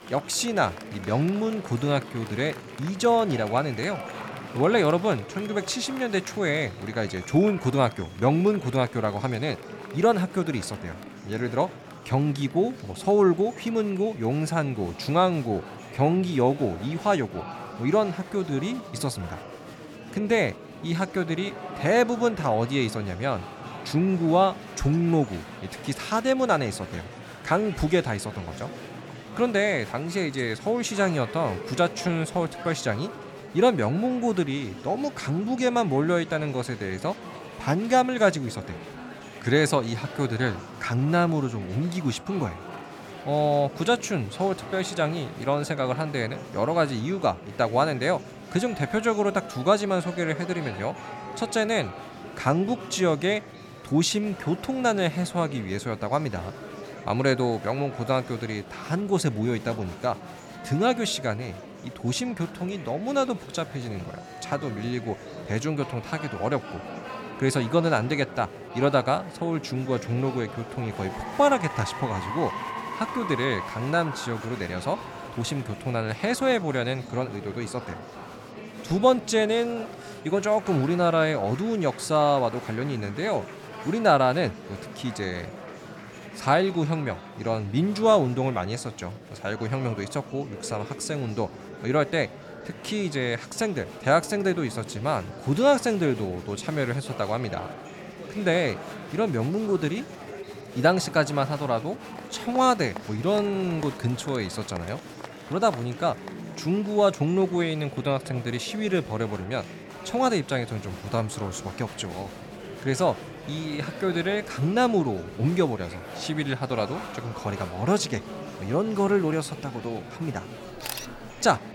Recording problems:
murmuring crowd; noticeable; throughout; 15 dB below the speech

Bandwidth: 18 kHz